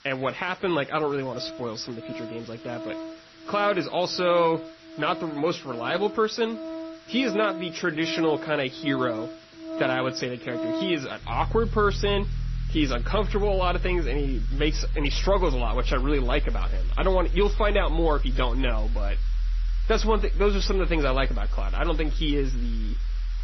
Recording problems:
garbled, watery; slightly; nothing above 6 kHz
background music; loud; throughout; 5 dB below the speech
hiss; faint; throughout; 25 dB below the speech

